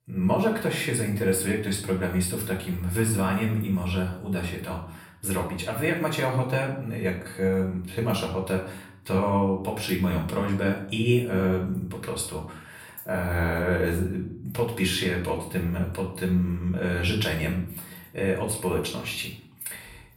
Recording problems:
off-mic speech; far
room echo; slight; dies away in 0.5 s

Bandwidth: 16 kHz